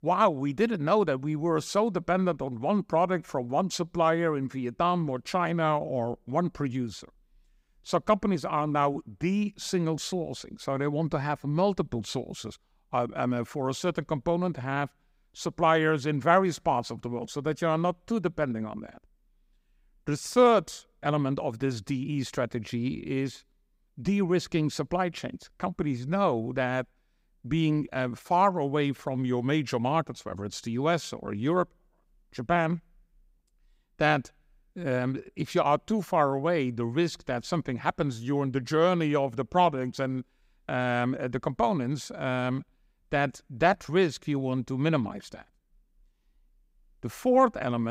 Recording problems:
abrupt cut into speech; at the end

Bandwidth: 15.5 kHz